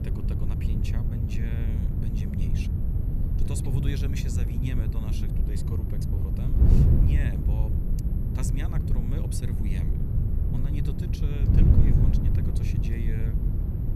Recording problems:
wind noise on the microphone; heavy; 3 dB above the speech
high-pitched whine; faint; throughout; 11.5 kHz, 25 dB below the speech

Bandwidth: 15.5 kHz